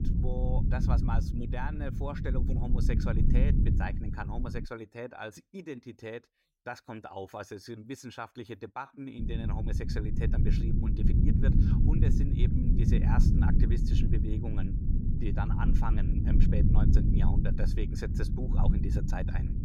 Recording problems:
low rumble; loud; until 4.5 s and from 9 s on; as loud as the speech

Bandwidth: 16 kHz